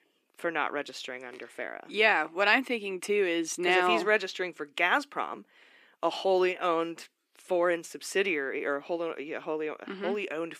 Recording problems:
thin; somewhat; fading below 300 Hz

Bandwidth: 14.5 kHz